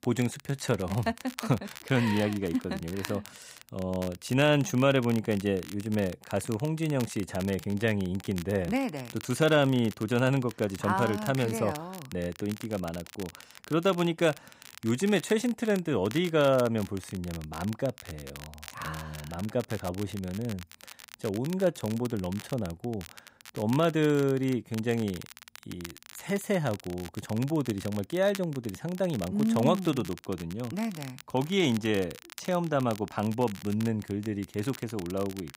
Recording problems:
crackle, like an old record; noticeable; 15 dB below the speech

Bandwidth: 15.5 kHz